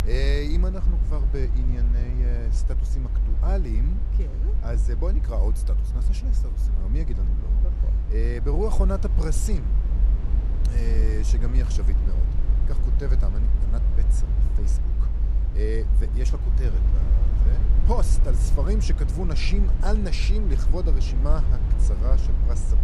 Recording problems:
low rumble; loud; throughout; 7 dB below the speech

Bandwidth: 15 kHz